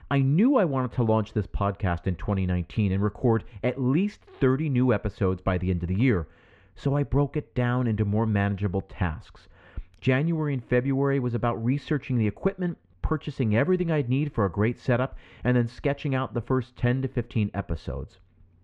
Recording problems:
muffled; slightly; fading above 2.5 kHz

